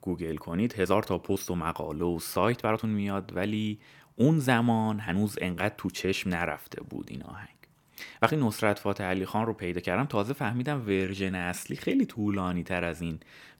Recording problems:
uneven, jittery; strongly; from 1 to 13 s

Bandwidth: 17 kHz